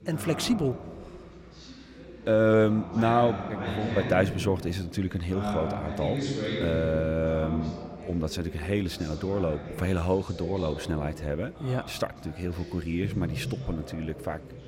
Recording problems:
background chatter; loud; throughout; 2 voices, 8 dB below the speech

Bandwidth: 16 kHz